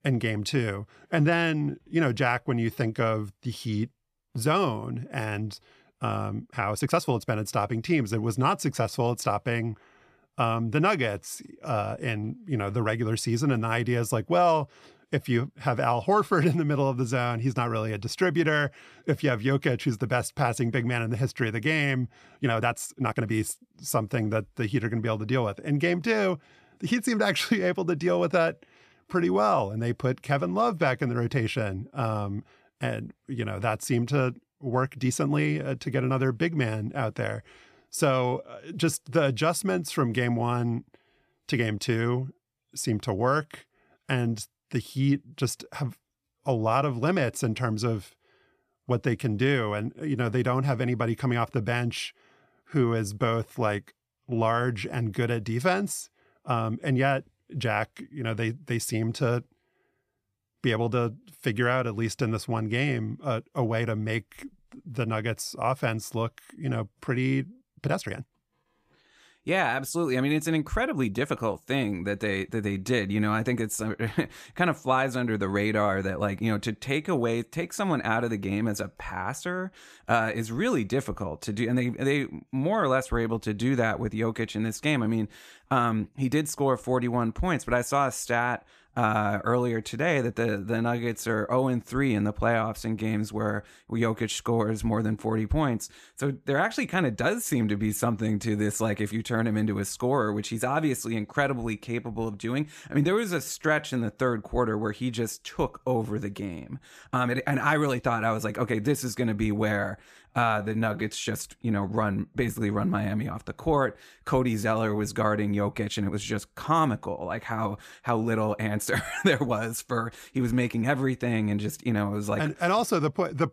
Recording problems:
uneven, jittery; strongly; from 1 s to 1:56

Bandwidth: 14.5 kHz